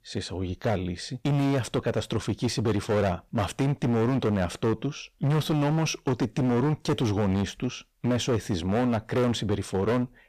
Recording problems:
distortion; heavy; 18% of the sound clipped

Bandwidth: 15 kHz